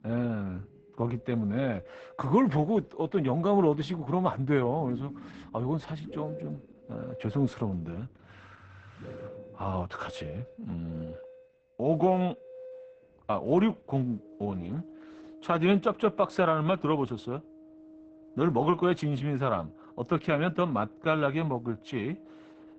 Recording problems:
garbled, watery; badly; nothing above 8 kHz
muffled; very slightly; fading above 2.5 kHz
background music; noticeable; throughout; 20 dB below the speech

